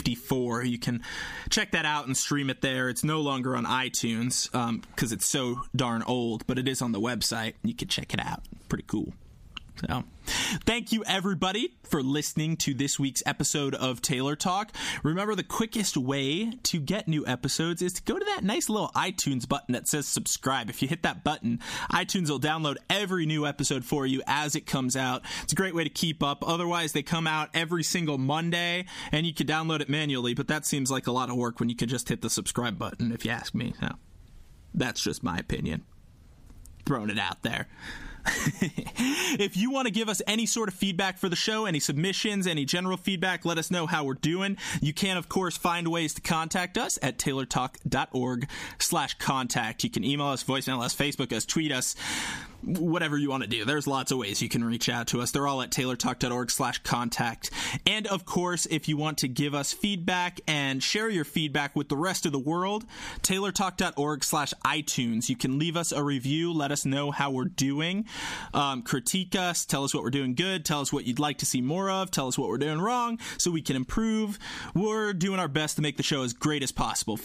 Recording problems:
squashed, flat; heavily

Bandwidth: 15 kHz